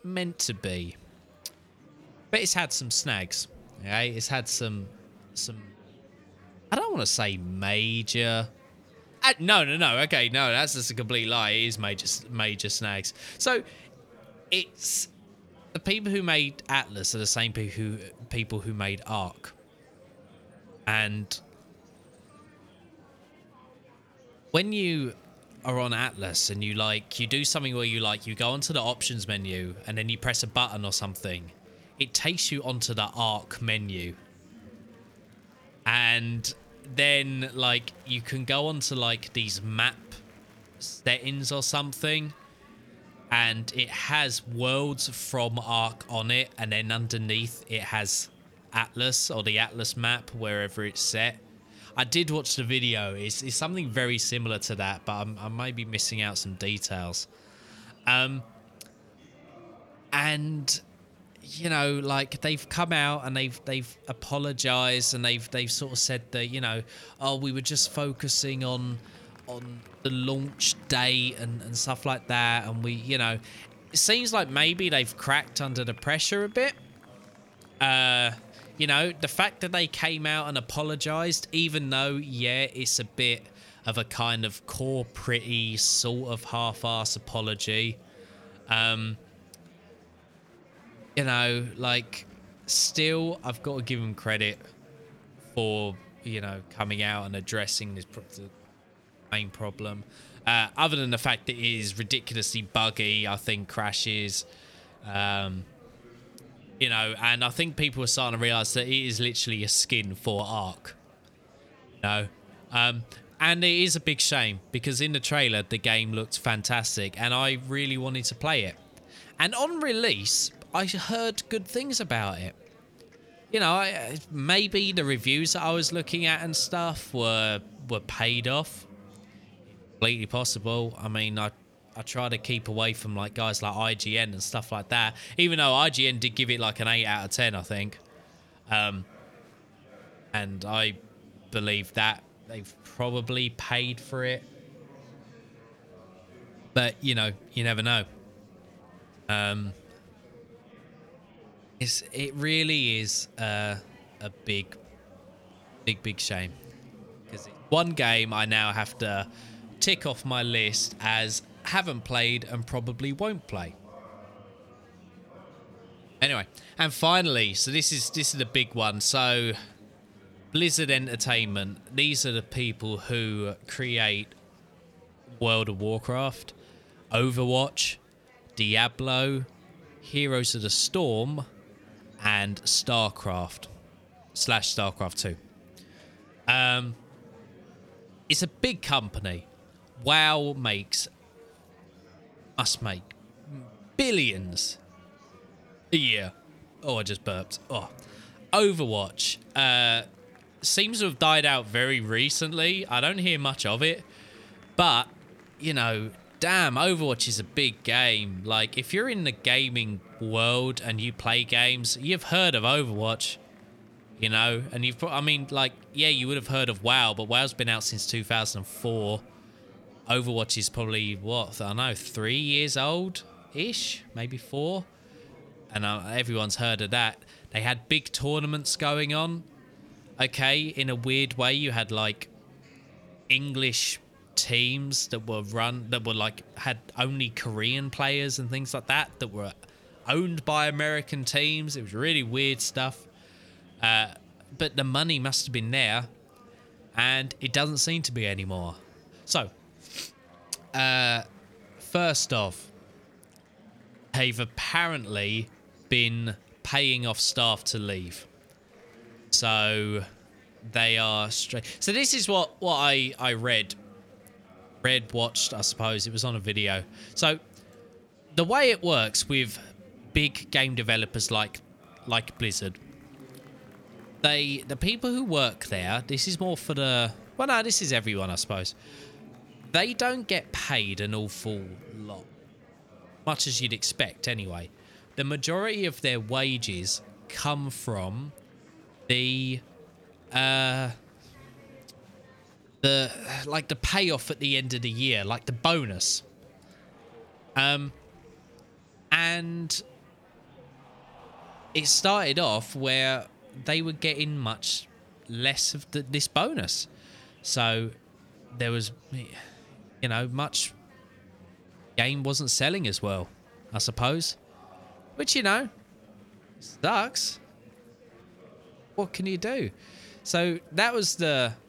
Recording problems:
murmuring crowd; faint; throughout; 25 dB below the speech

